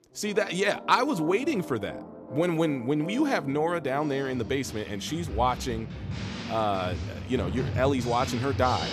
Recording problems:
background music; loud; throughout; 9 dB below the speech

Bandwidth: 14.5 kHz